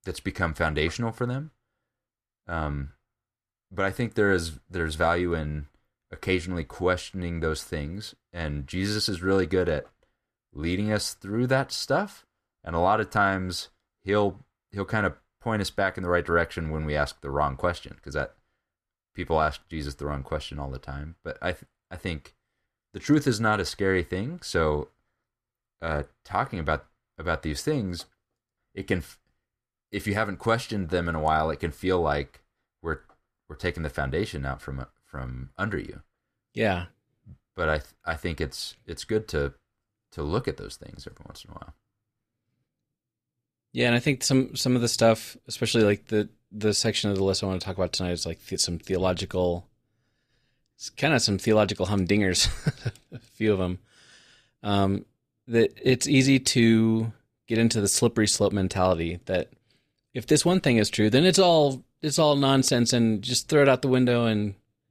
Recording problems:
none

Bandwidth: 14.5 kHz